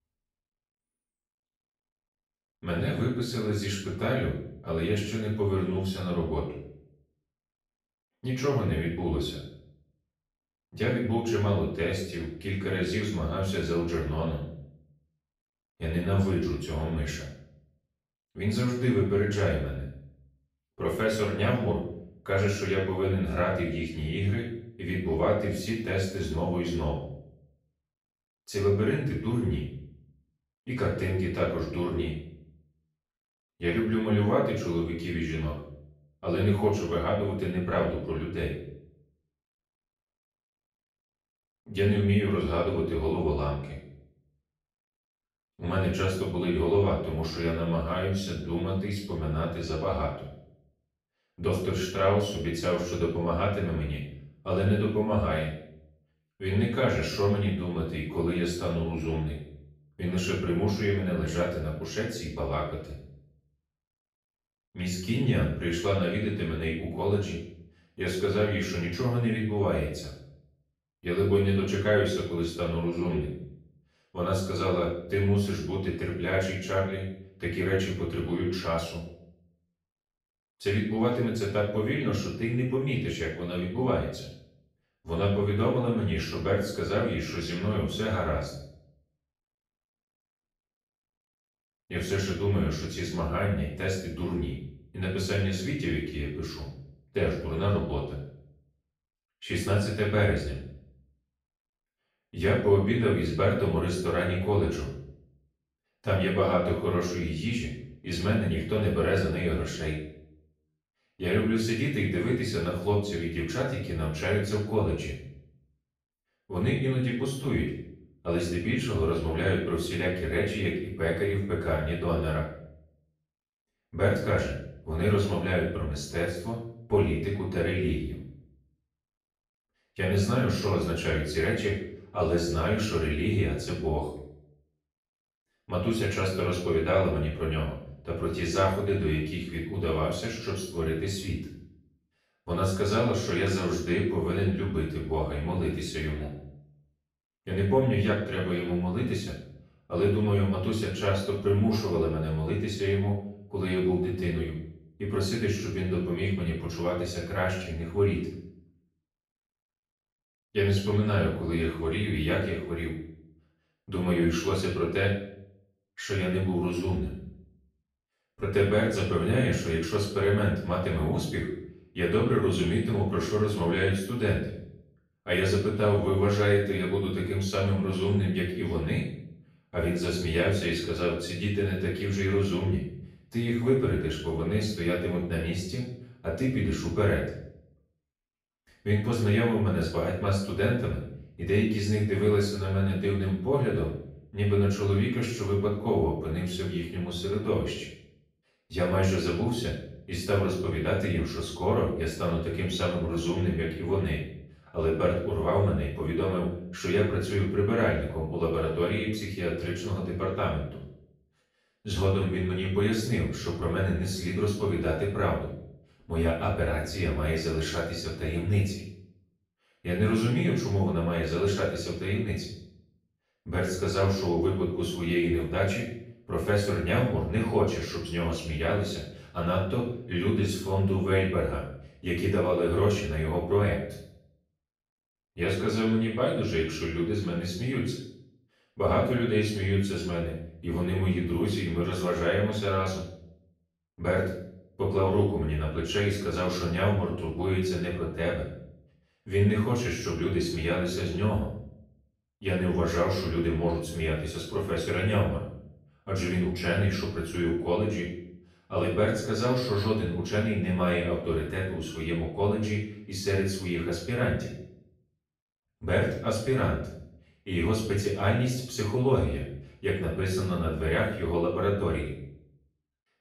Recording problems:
off-mic speech; far
room echo; noticeable; dies away in 0.6 s

